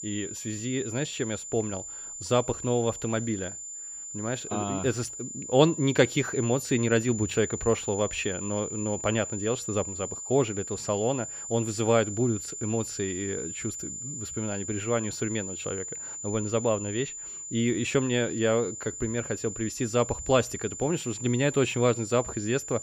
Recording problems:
high-pitched whine; loud; throughout; 7 kHz, 7 dB below the speech

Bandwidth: 15.5 kHz